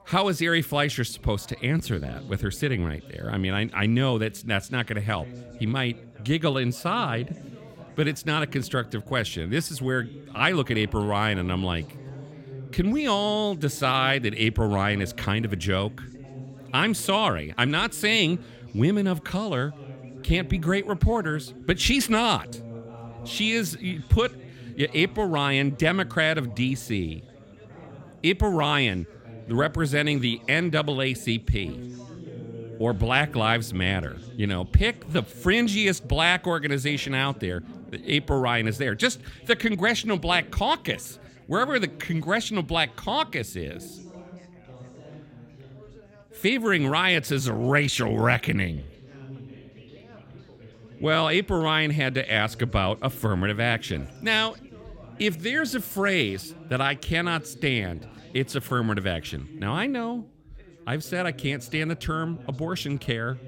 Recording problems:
background chatter; noticeable; throughout; 3 voices, 20 dB below the speech

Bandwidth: 16.5 kHz